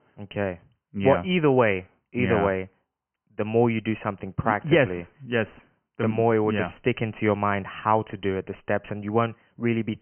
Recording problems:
high frequencies cut off; severe; nothing above 3 kHz

